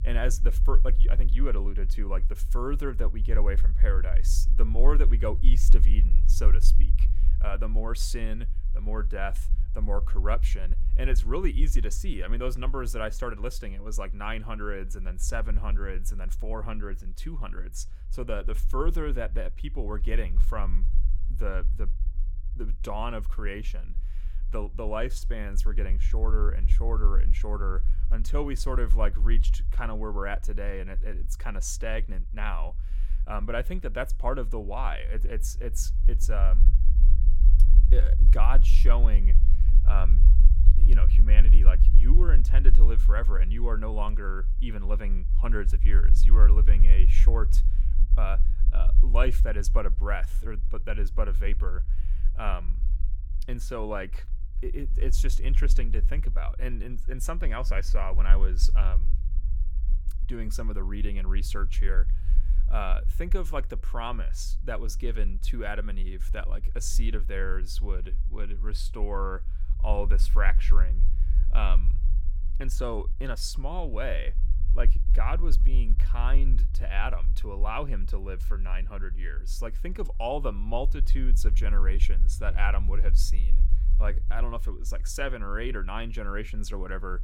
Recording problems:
low rumble; noticeable; throughout; 15 dB below the speech

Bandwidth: 17 kHz